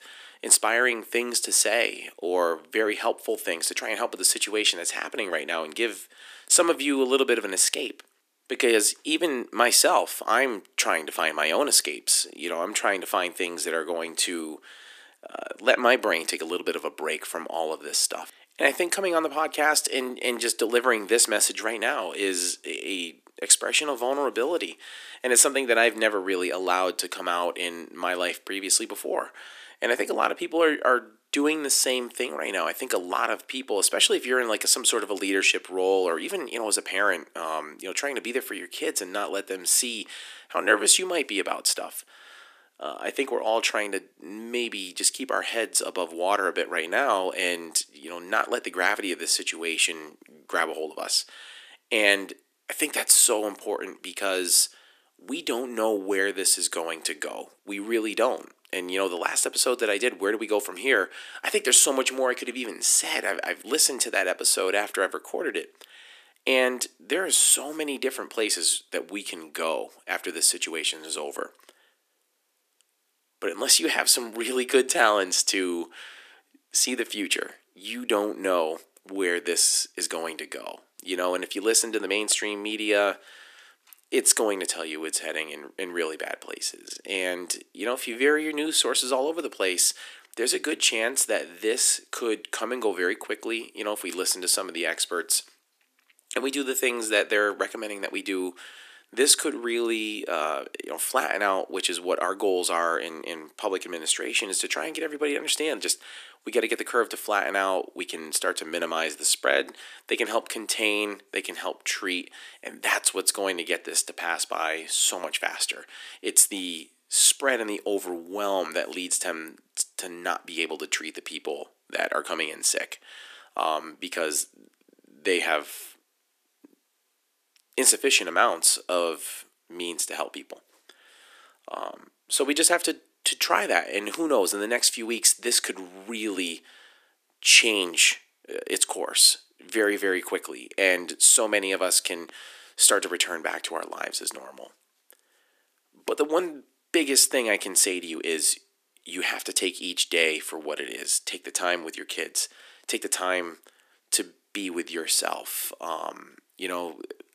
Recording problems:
thin; somewhat; fading below 300 Hz

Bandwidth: 14.5 kHz